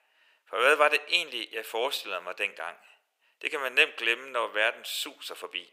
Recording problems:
thin; very; fading below 450 Hz

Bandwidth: 15.5 kHz